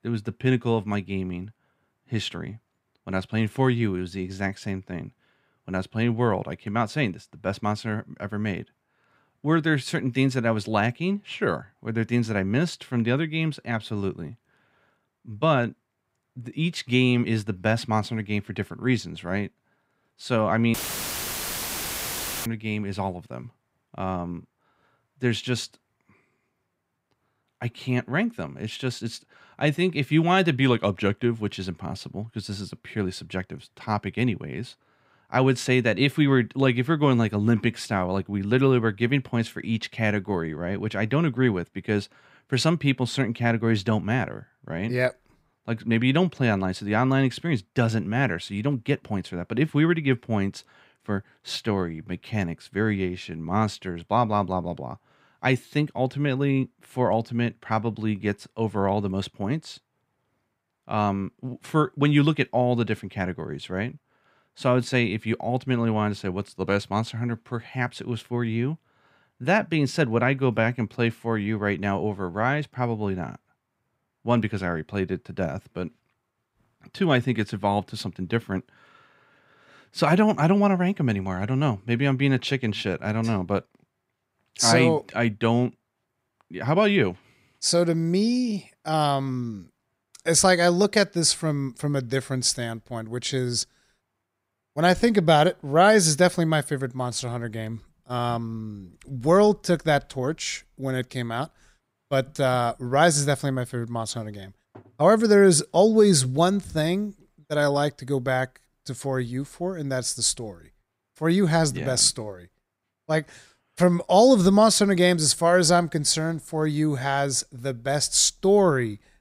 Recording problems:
audio cutting out; filled with static; at 21 s for 1.5 s

